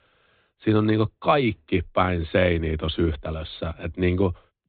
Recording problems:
high frequencies cut off; severe; nothing above 4 kHz

